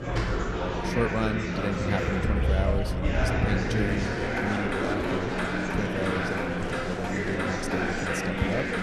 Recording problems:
murmuring crowd; very loud; throughout; 2 dB above the speech
traffic noise; loud; throughout; 1 dB below the speech

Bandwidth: 13.5 kHz